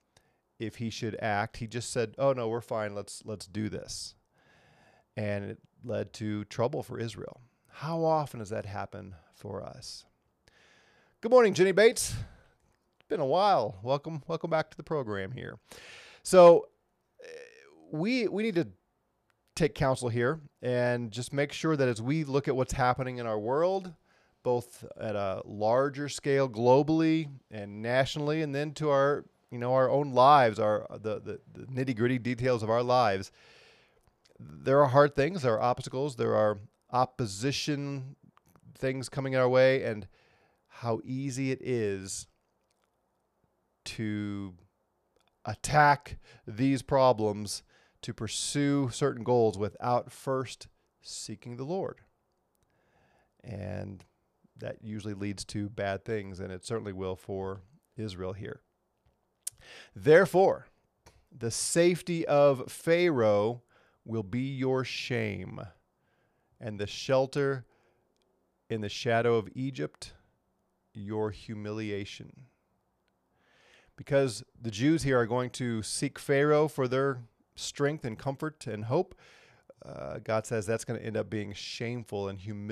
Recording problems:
abrupt cut into speech; at the end

